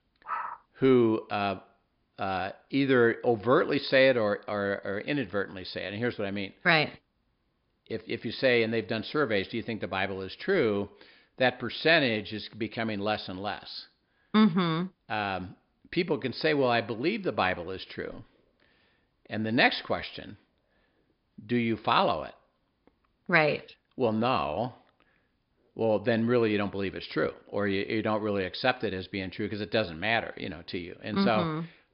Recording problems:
high frequencies cut off; noticeable; nothing above 5 kHz

